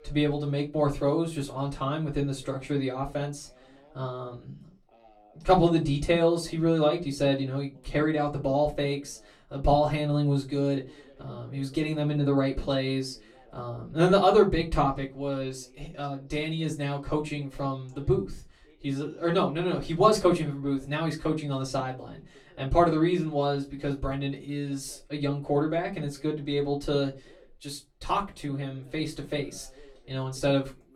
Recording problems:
off-mic speech; far
room echo; very slight; dies away in 0.2 s
voice in the background; faint; throughout; 30 dB below the speech

